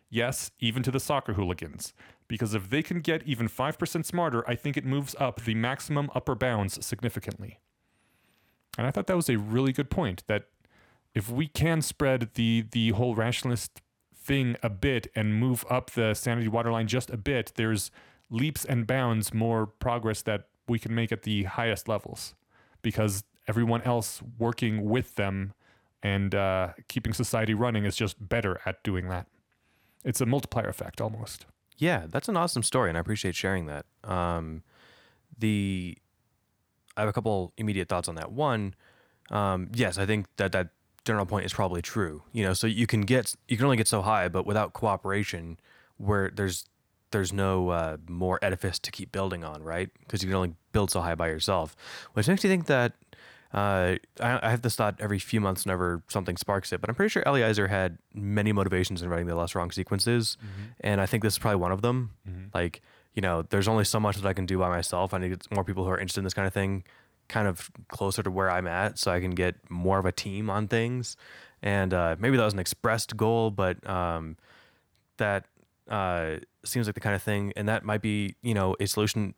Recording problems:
none

